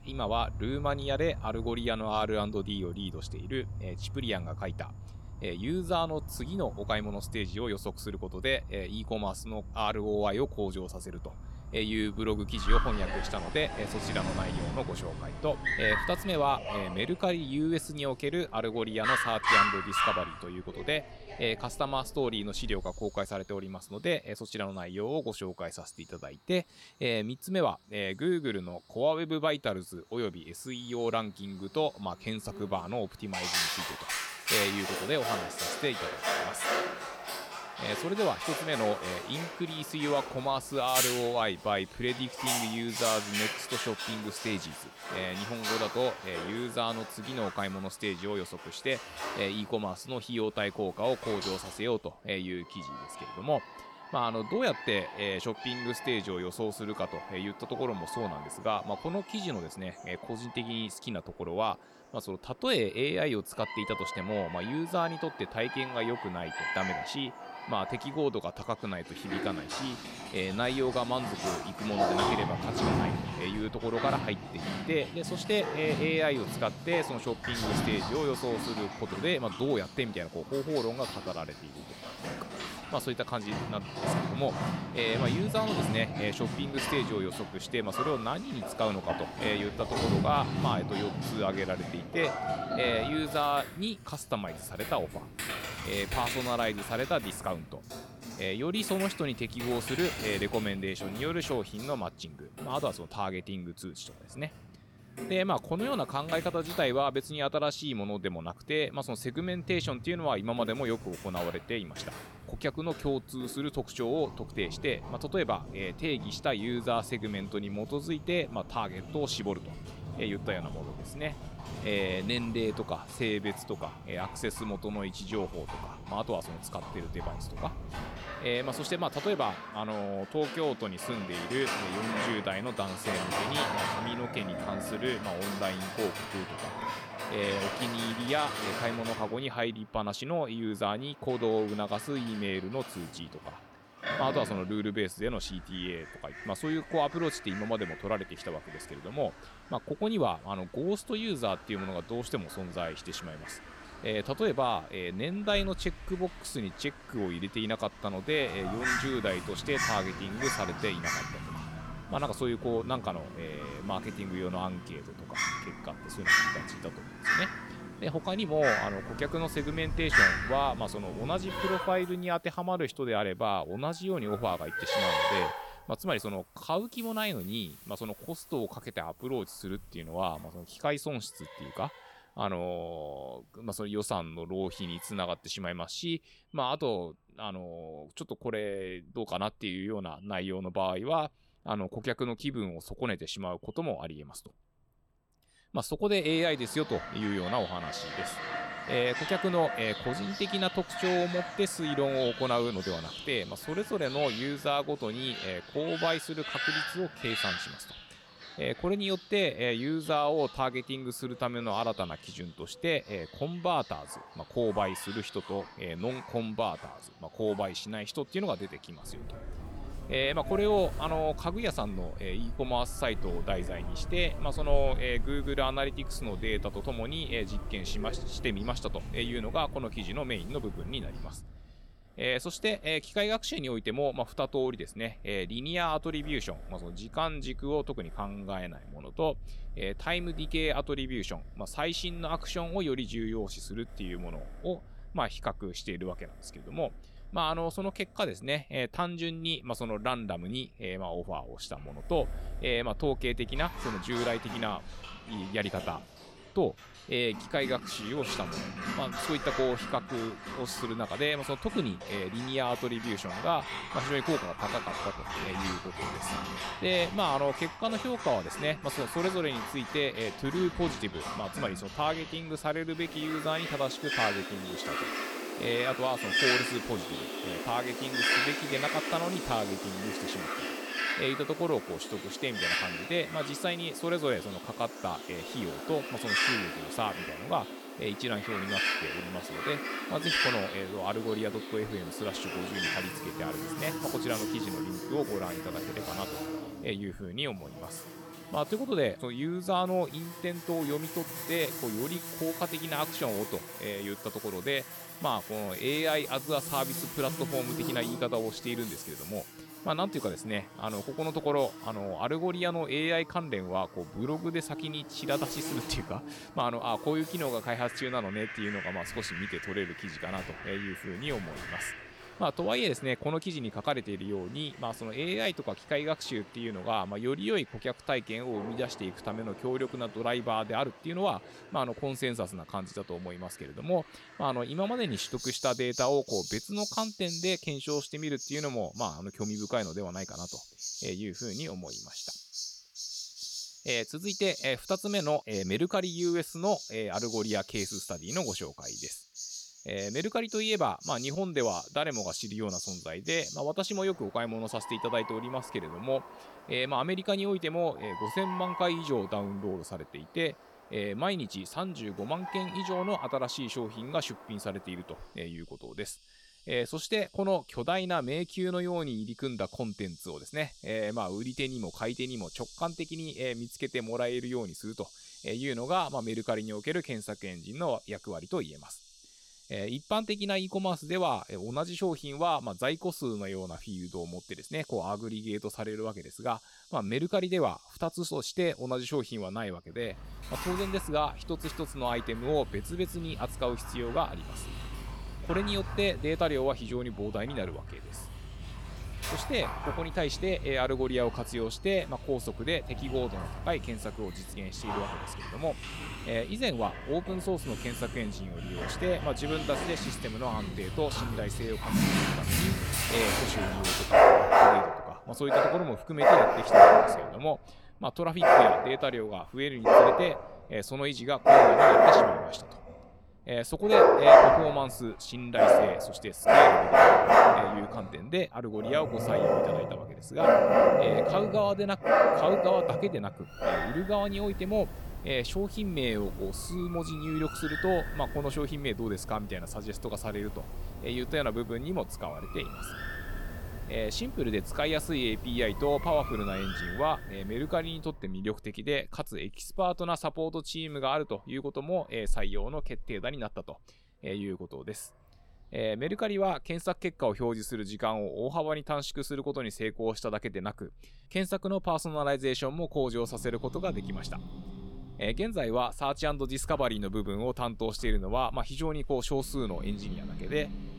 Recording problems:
animal sounds; very loud; throughout; 2 dB above the speech

